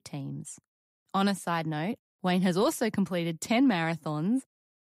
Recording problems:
none

